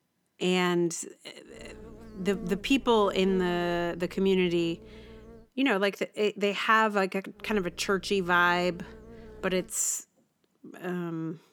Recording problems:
electrical hum; faint; from 1.5 to 5.5 s and from 7.5 to 9.5 s; 60 Hz, 25 dB below the speech

